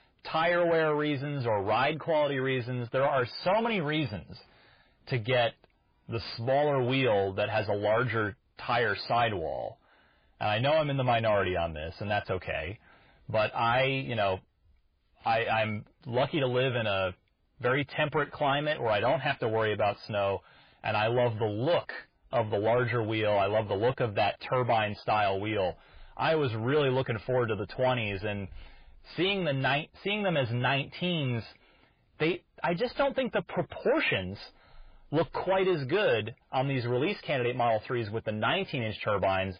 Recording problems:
garbled, watery; badly; nothing above 5 kHz
distortion; slight; 10 dB below the speech

